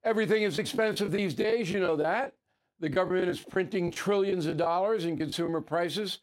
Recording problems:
choppy; very; 9% of the speech affected

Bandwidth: 16 kHz